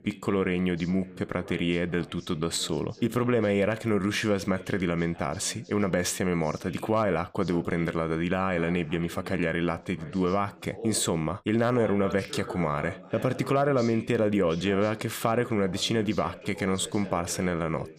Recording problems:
voice in the background; noticeable; throughout; 15 dB below the speech

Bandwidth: 15 kHz